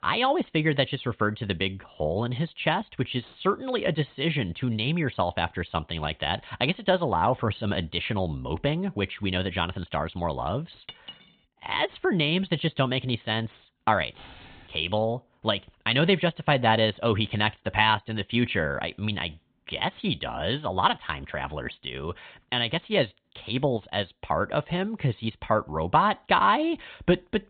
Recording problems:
high frequencies cut off; severe; nothing above 4 kHz
clattering dishes; faint; at 11 s; peak 15 dB below the speech
jangling keys; faint; at 14 s; peak 20 dB below the speech

